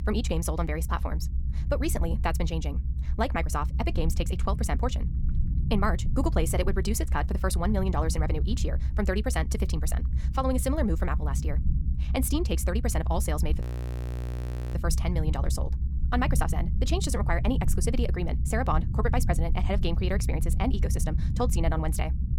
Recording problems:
wrong speed, natural pitch; too fast; 1.5 times normal speed
low rumble; noticeable; throughout; 15 dB below the speech
audio freezing; at 14 s for 1 s

